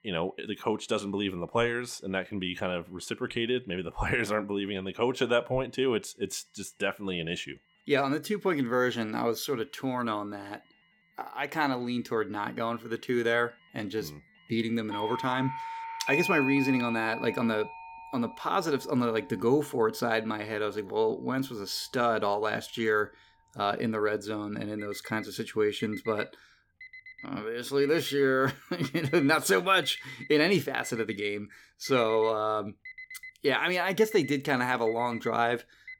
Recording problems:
alarms or sirens; noticeable; throughout; 10 dB below the speech

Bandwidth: 18.5 kHz